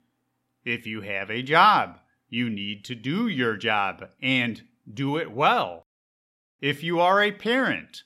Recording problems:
none

